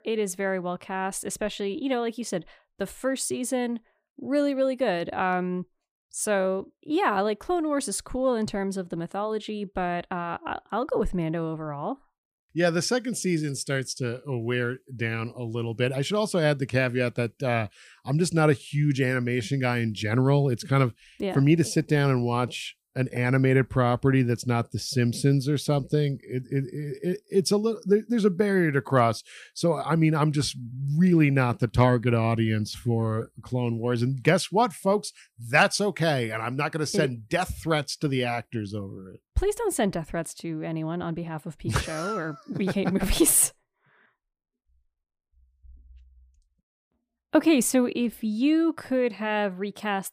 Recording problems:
none

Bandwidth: 15 kHz